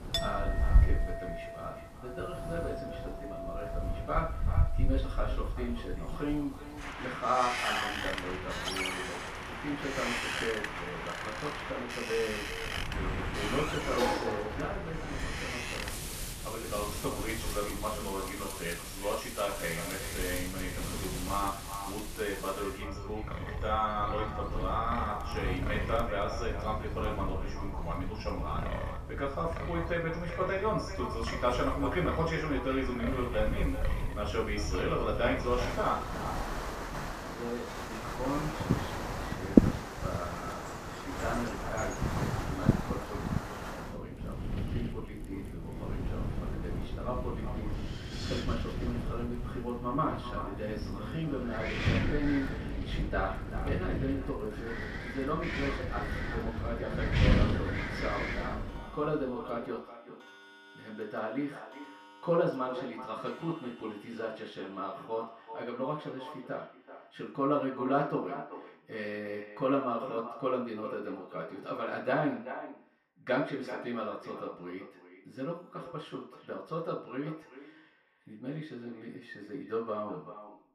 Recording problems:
echo of what is said; strong; throughout; 380 ms later, 10 dB below the speech
off-mic speech; far
room echo; noticeable; dies away in 0.5 s
wind in the background; very loud; until 59 s; as loud as the speech
household noises; loud; throughout; 8 dB below the speech

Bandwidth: 14.5 kHz